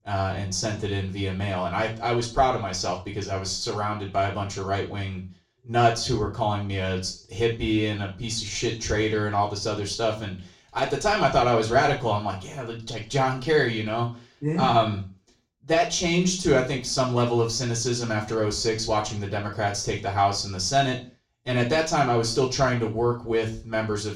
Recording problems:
off-mic speech; far
room echo; slight; dies away in 0.3 s

